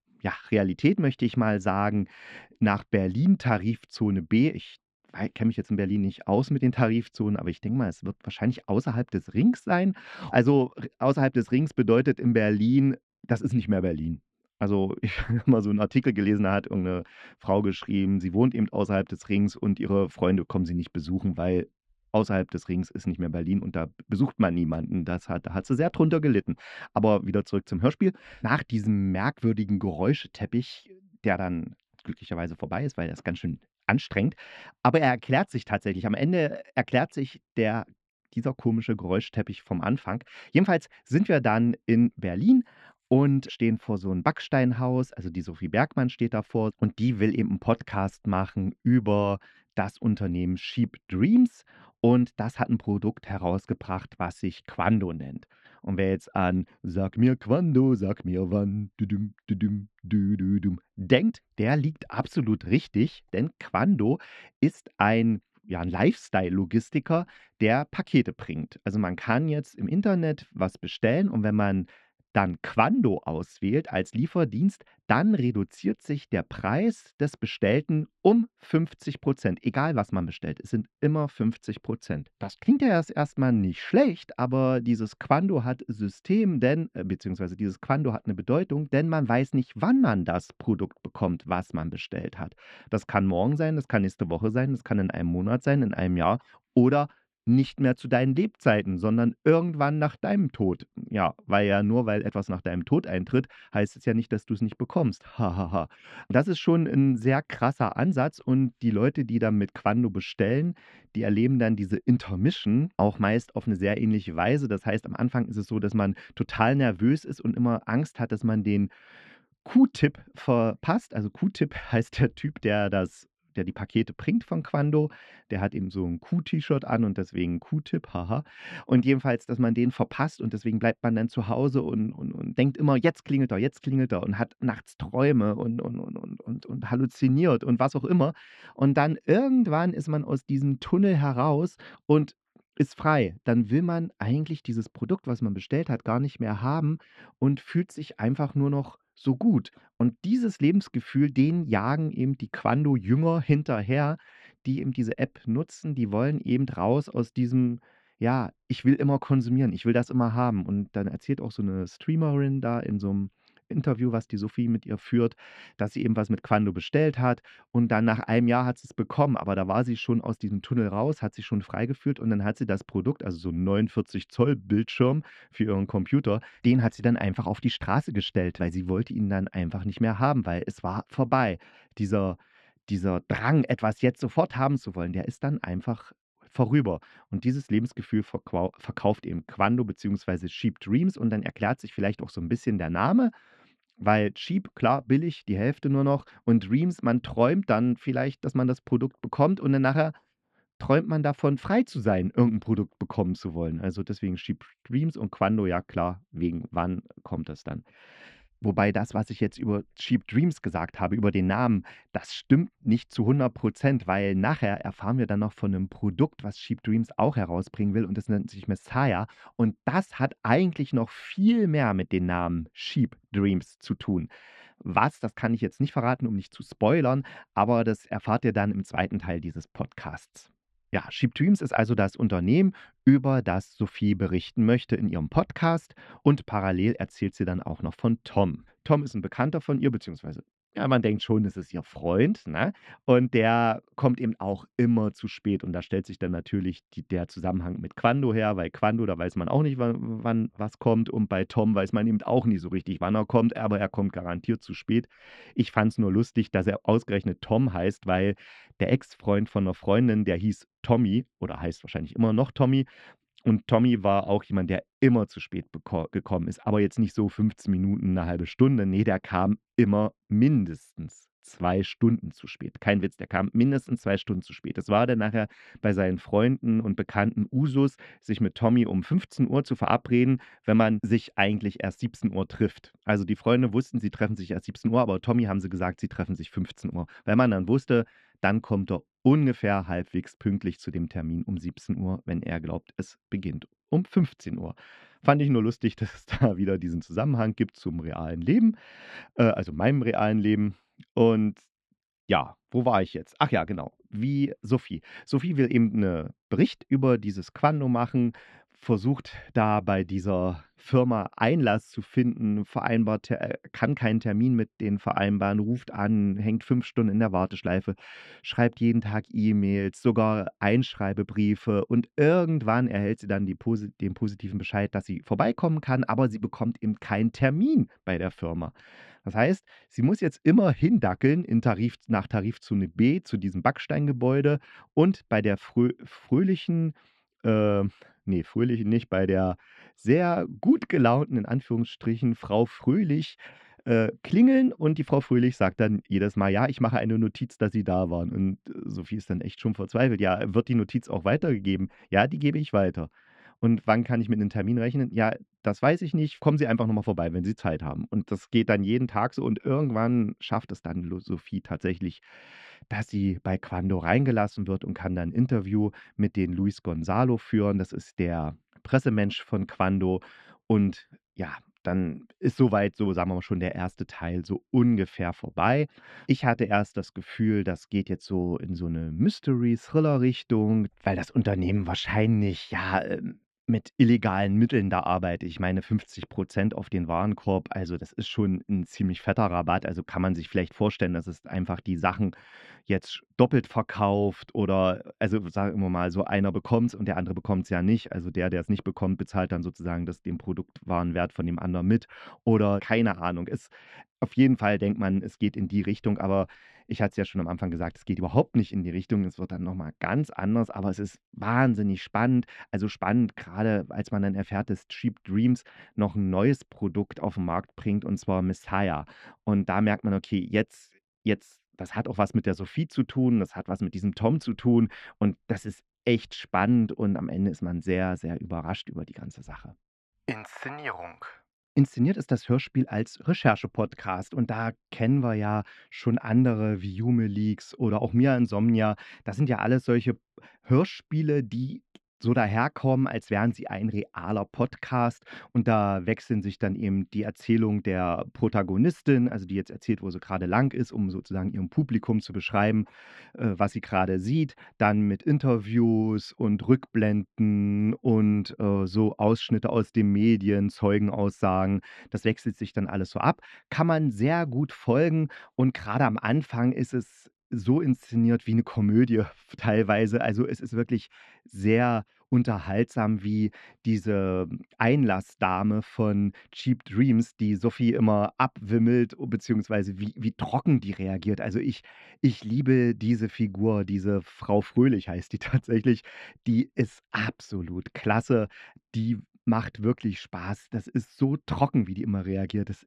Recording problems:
muffled; slightly; fading above 3 kHz

